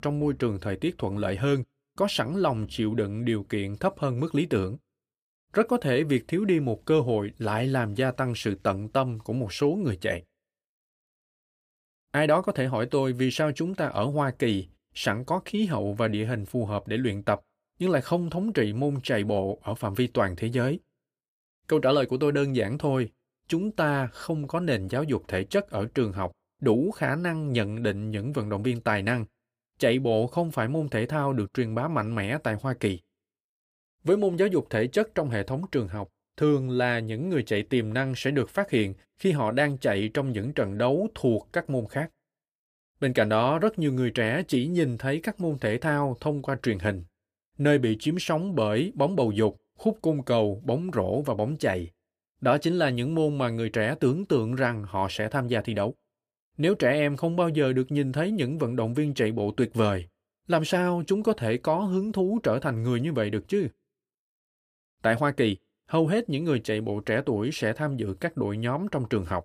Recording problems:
none

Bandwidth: 15 kHz